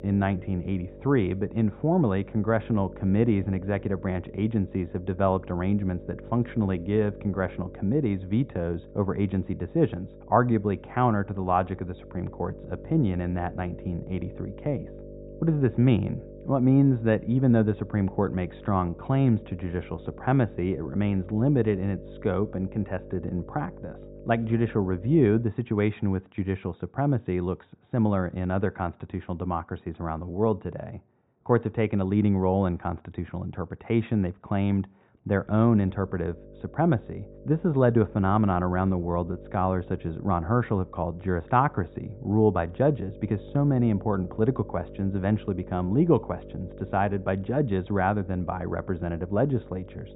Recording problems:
high frequencies cut off; severe; nothing above 4 kHz
muffled; very slightly; fading above 2.5 kHz
electrical hum; noticeable; until 25 s and from 35 s on; 50 Hz, 20 dB below the speech

